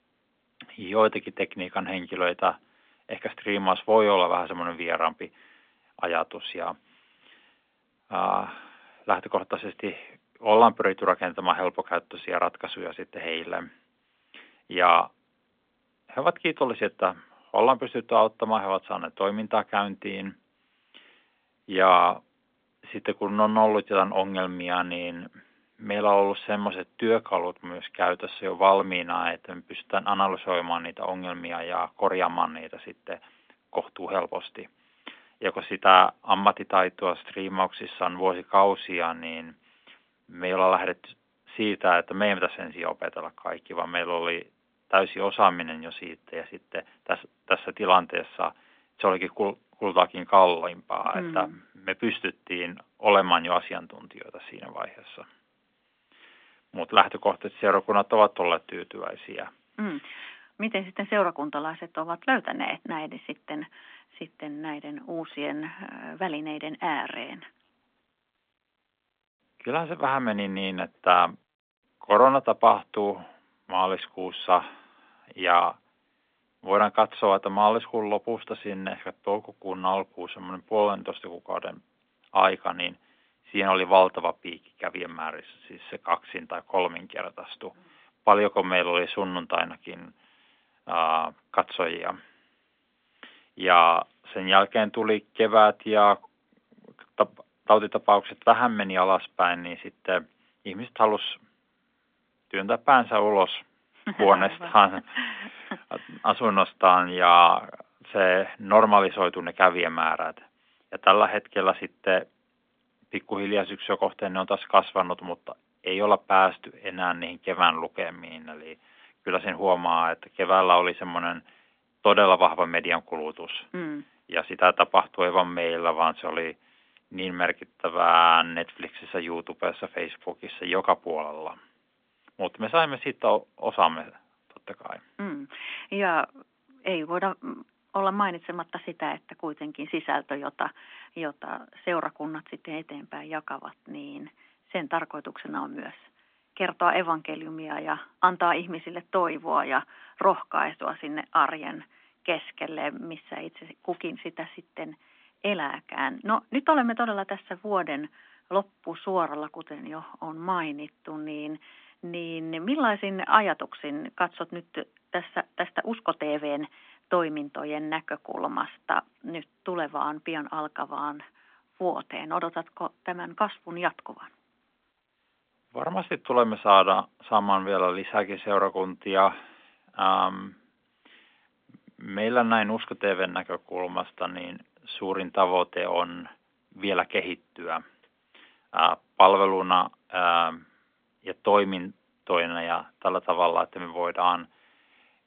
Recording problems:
phone-call audio; nothing above 3.5 kHz

